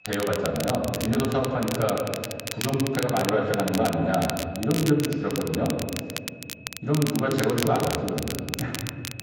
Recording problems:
off-mic speech; far
echo of what is said; noticeable; throughout; 160 ms later, 10 dB below the speech
room echo; noticeable; dies away in 1.5 s
garbled, watery; slightly
crackle, like an old record; loud; 8 dB below the speech
high-pitched whine; faint; throughout; 2.5 kHz, 25 dB below the speech

